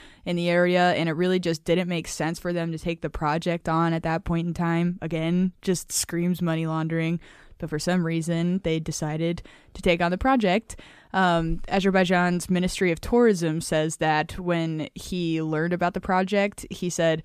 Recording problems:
none

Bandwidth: 14.5 kHz